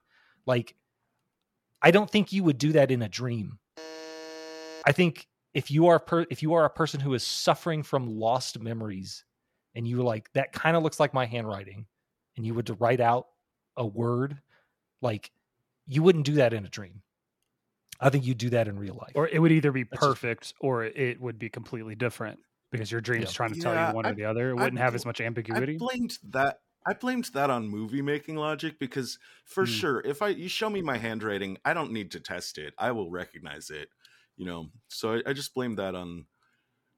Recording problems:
none

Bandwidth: 17 kHz